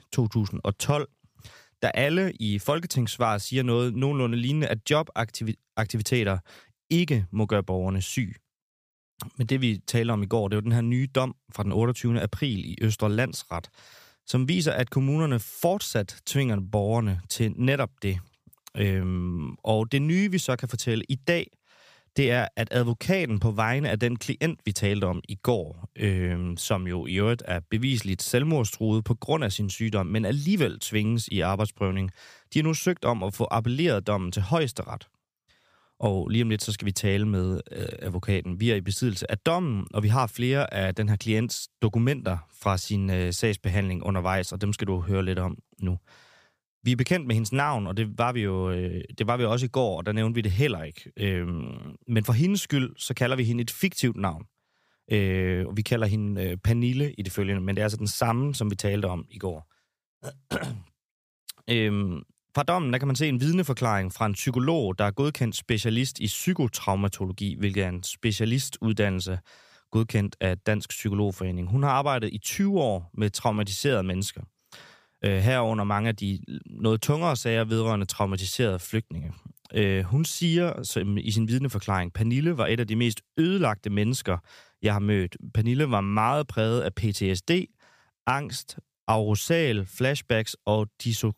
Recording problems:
none

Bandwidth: 15 kHz